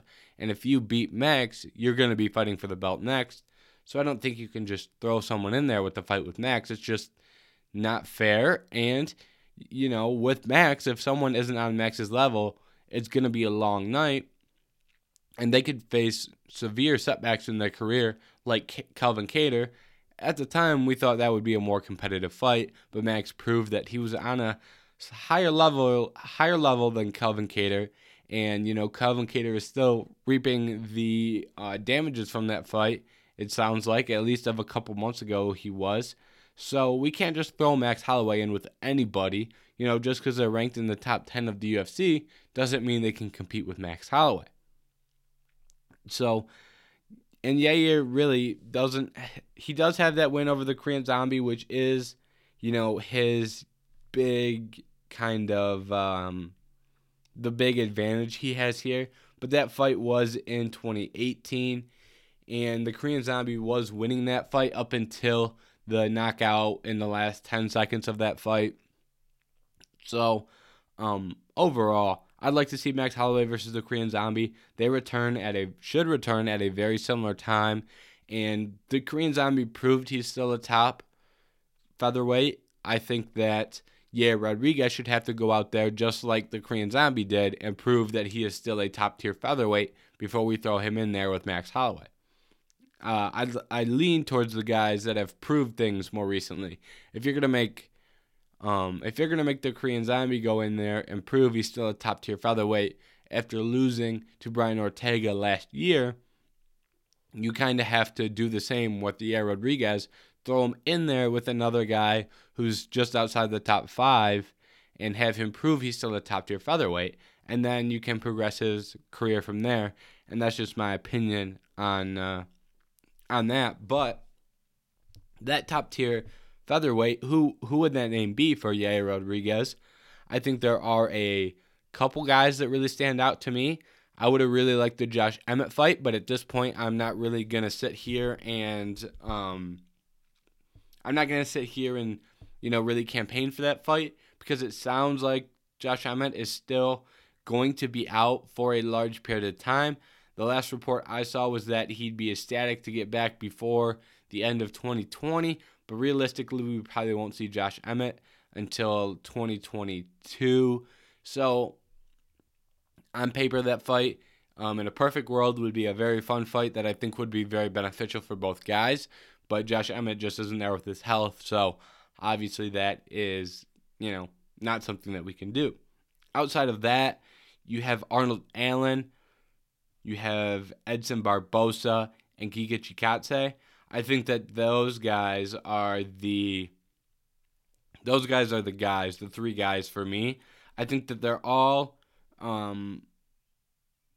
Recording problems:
none

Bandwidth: 16.5 kHz